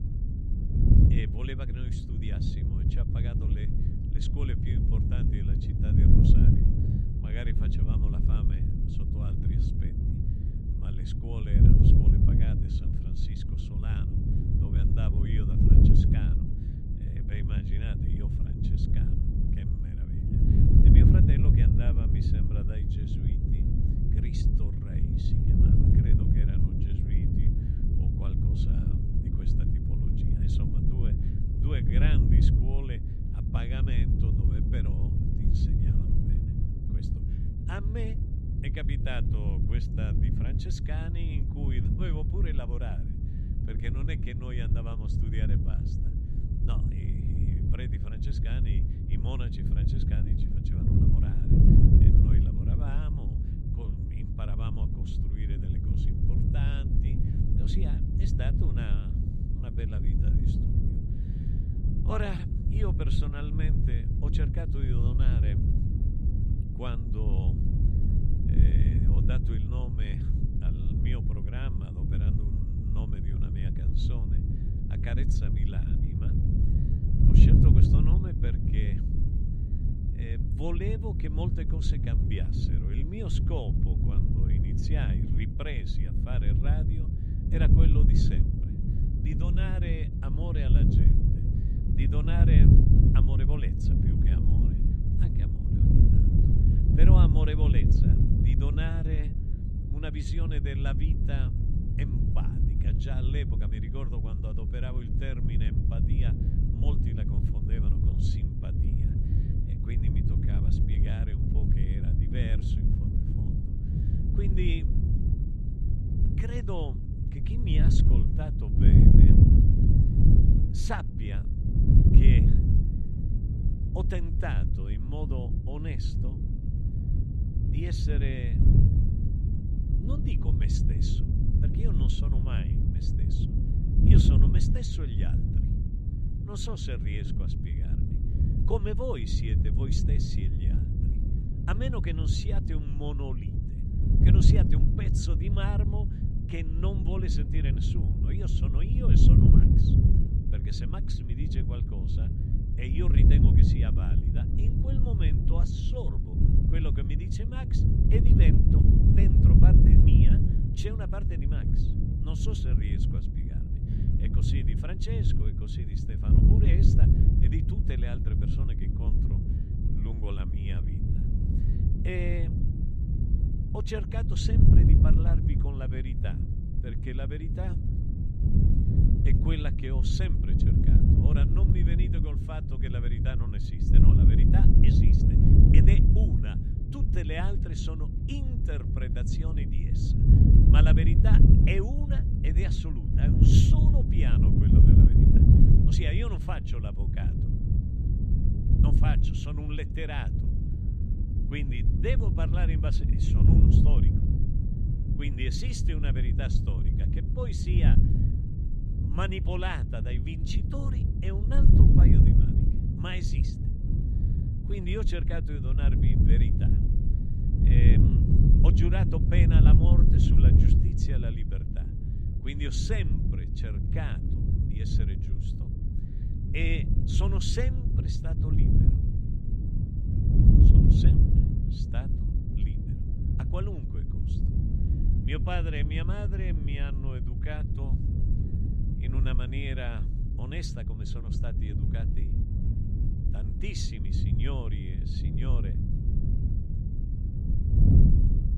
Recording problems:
wind noise on the microphone; heavy; 2 dB above the speech

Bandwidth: 14 kHz